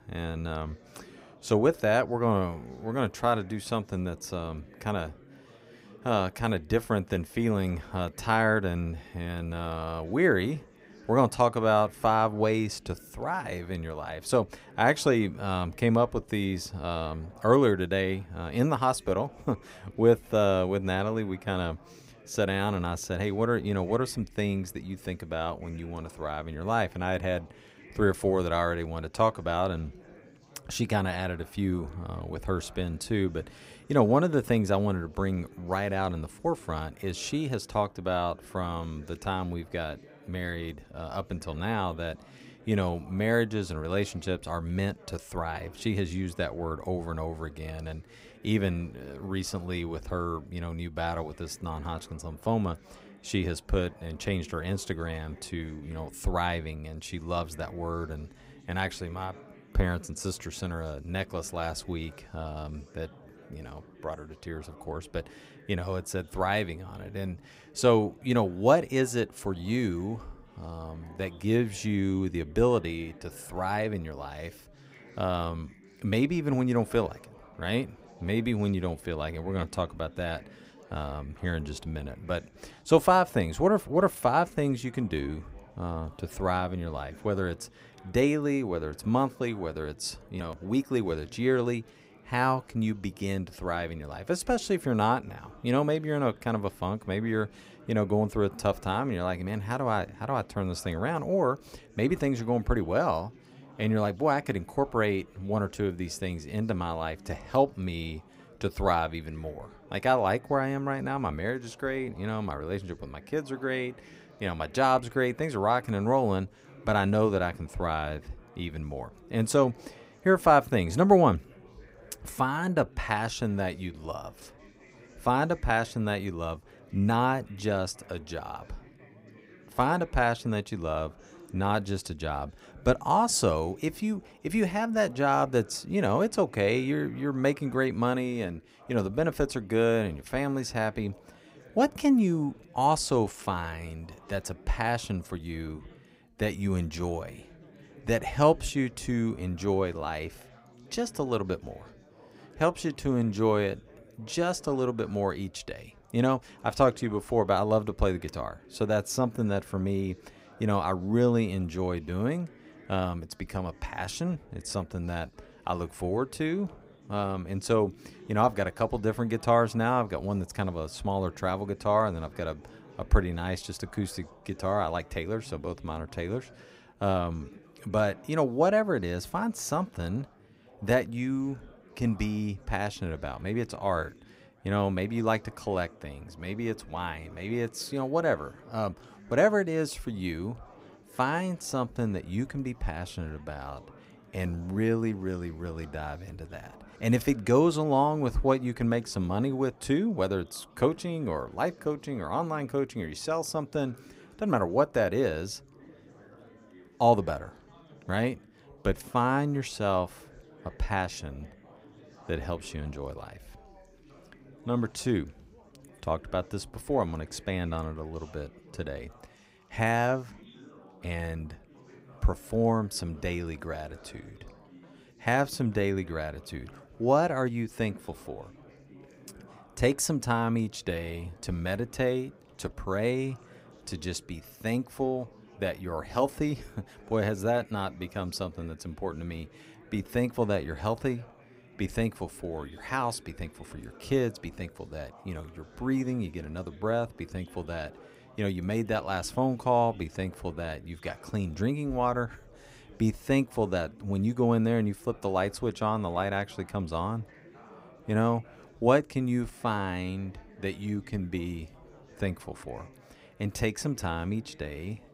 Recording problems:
chatter from many people; faint; throughout; 25 dB below the speech

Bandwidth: 15.5 kHz